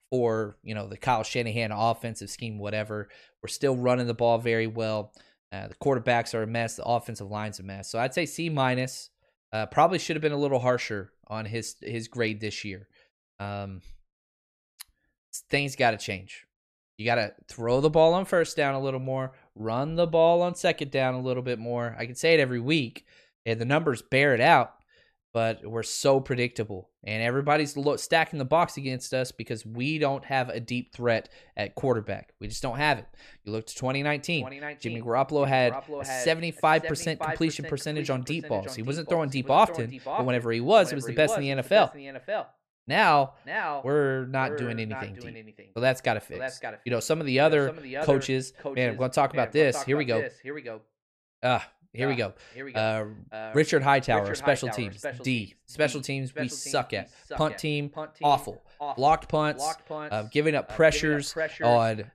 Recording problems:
echo of what is said; strong; from 34 s on; 570 ms later, 10 dB below the speech

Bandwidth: 14.5 kHz